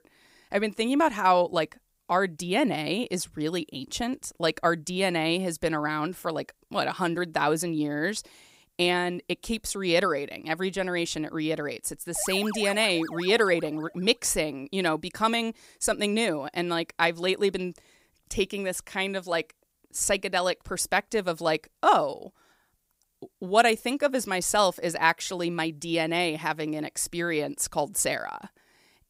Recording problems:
none

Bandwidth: 15.5 kHz